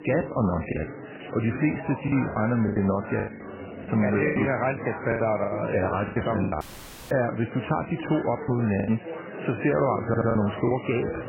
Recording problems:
garbled, watery; badly; nothing above 2.5 kHz
chatter from many people; noticeable; throughout; 10 dB below the speech
choppy; very; 10% of the speech affected
audio cutting out; at 6.5 s for 0.5 s
audio stuttering; at 10 s

